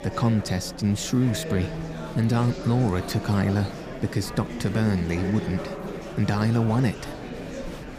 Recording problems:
murmuring crowd; loud; throughout; 9 dB below the speech

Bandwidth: 15 kHz